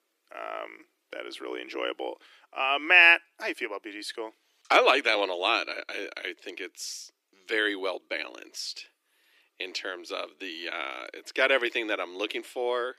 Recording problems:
thin; very; fading below 300 Hz

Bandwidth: 15 kHz